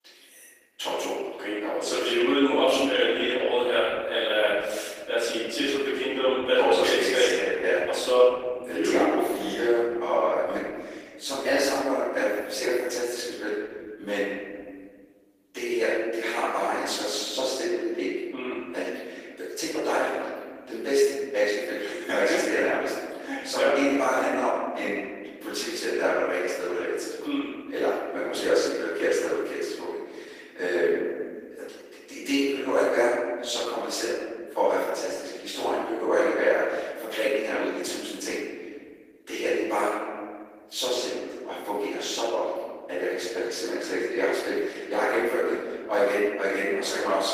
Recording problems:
room echo; strong; dies away in 1.6 s
off-mic speech; far
thin; somewhat; fading below 300 Hz
garbled, watery; slightly; nothing above 15 kHz

